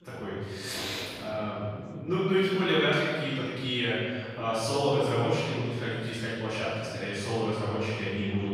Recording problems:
room echo; strong; dies away in 1.6 s
off-mic speech; far
background chatter; faint; throughout; 4 voices, 25 dB below the speech

